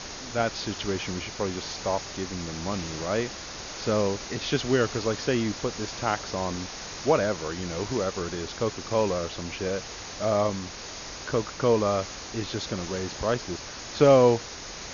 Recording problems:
high frequencies cut off; noticeable; nothing above 7 kHz
hiss; loud; throughout; 9 dB below the speech

